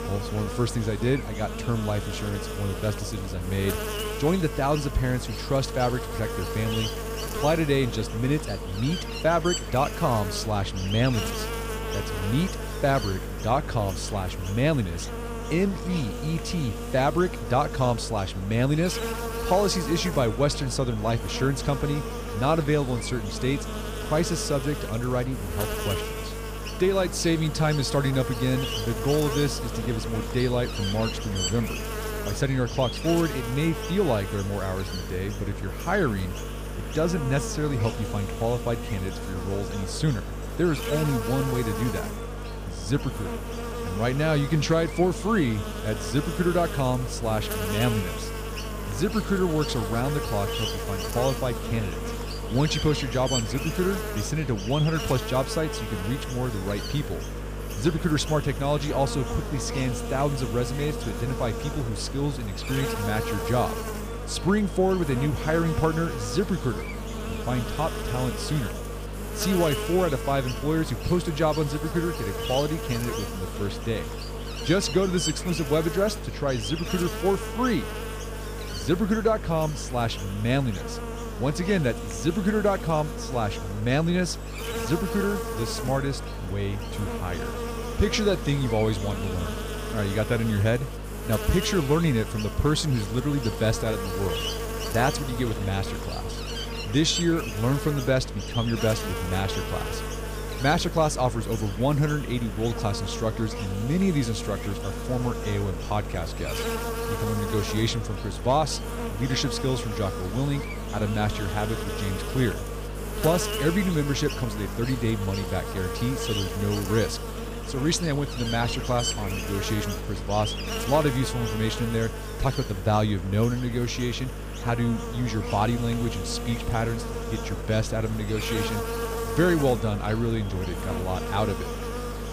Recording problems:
electrical hum; loud; throughout; 50 Hz, 5 dB below the speech

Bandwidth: 15 kHz